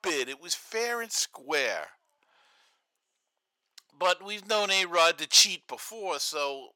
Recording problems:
thin; very; fading below 700 Hz

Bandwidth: 17 kHz